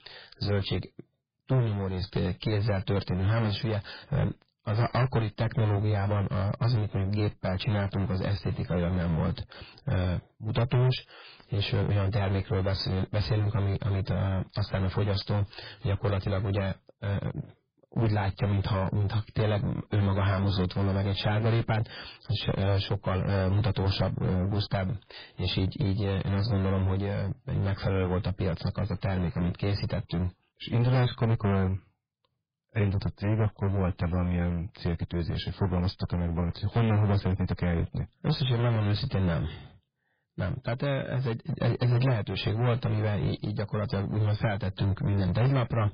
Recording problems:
distortion; heavy; 15% of the sound clipped
garbled, watery; badly; nothing above 5 kHz

